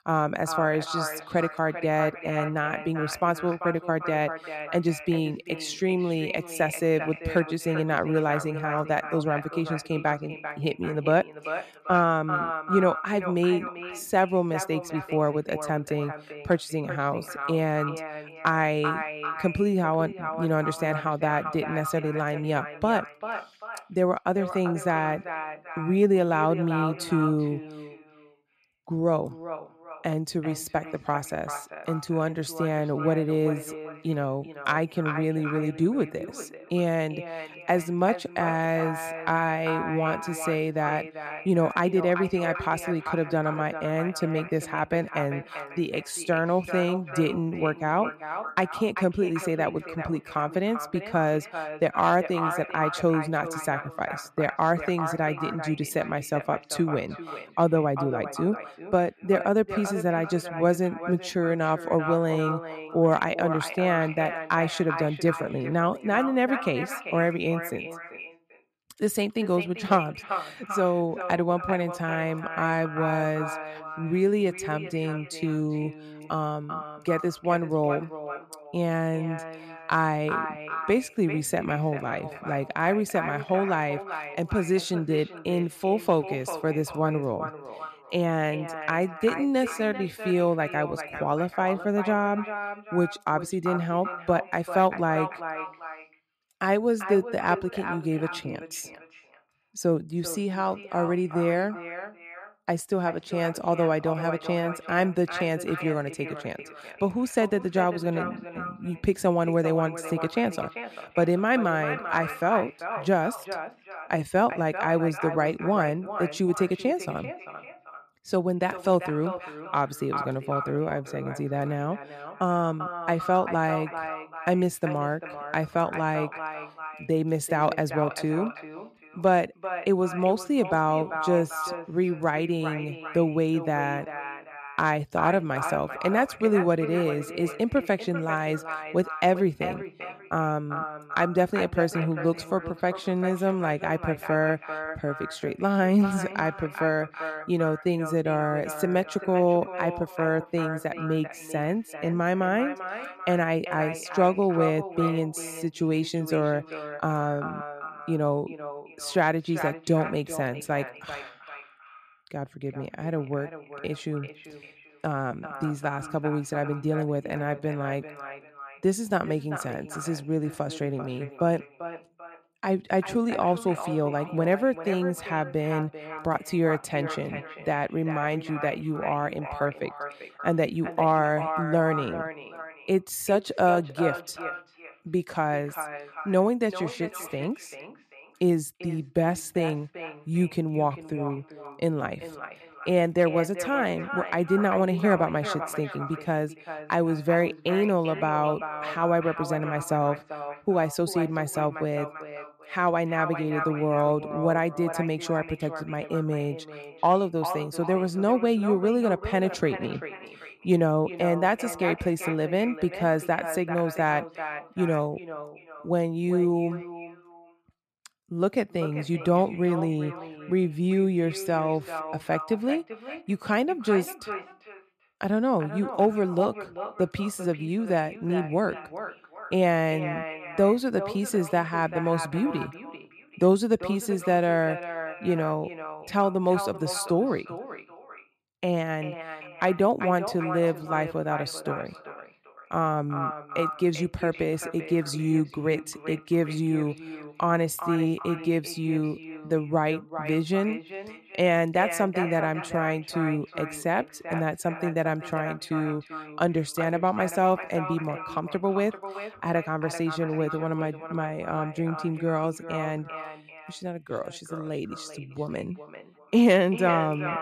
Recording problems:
echo of what is said; strong; throughout; 390 ms later, 10 dB below the speech

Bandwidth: 14.5 kHz